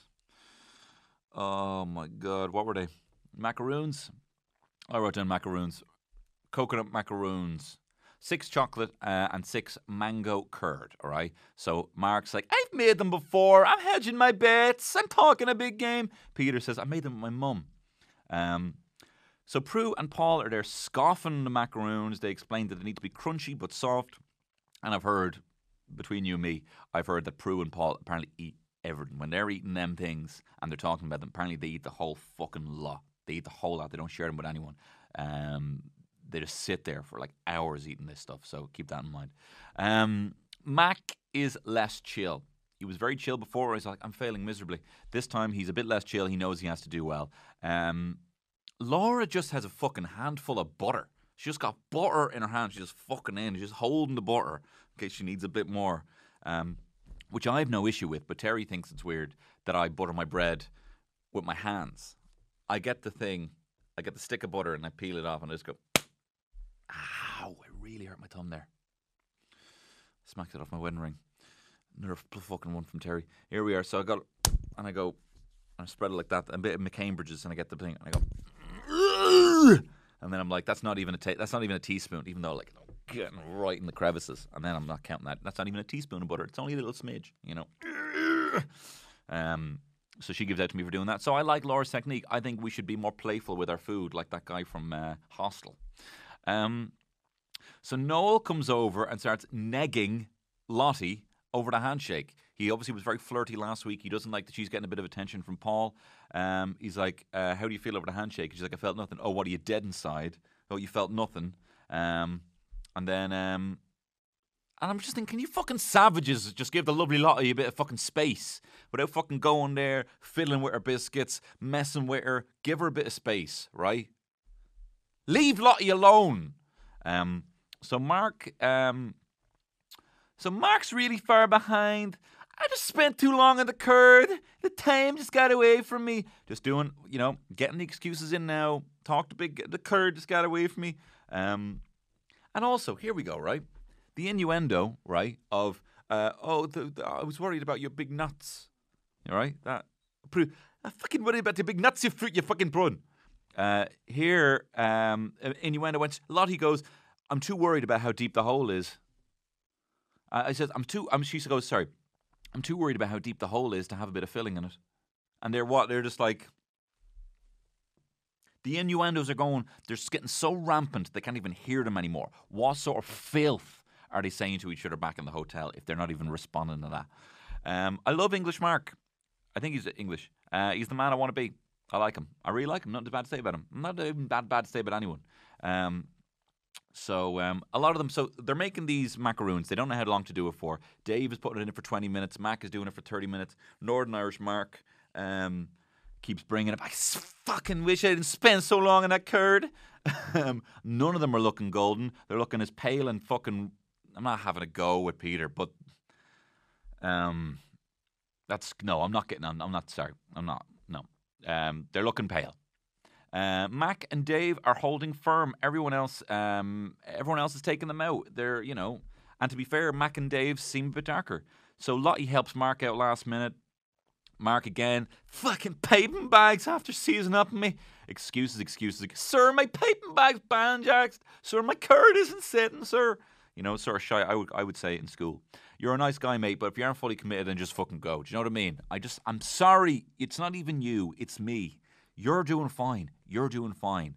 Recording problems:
none

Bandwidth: 14.5 kHz